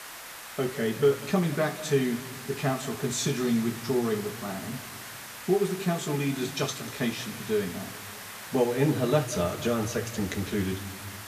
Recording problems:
room echo; slight; dies away in 1.8 s
off-mic speech; somewhat distant
hiss; noticeable; throughout; 10 dB below the speech

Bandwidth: 14.5 kHz